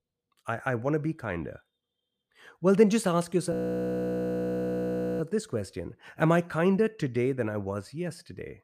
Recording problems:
audio freezing; at 3.5 s for 1.5 s

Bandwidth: 14.5 kHz